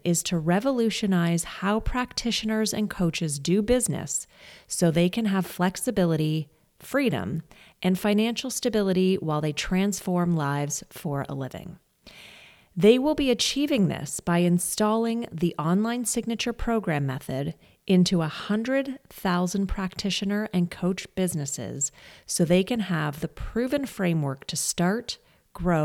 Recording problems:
abrupt cut into speech; at the end

